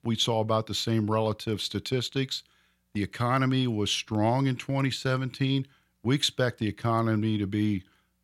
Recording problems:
none

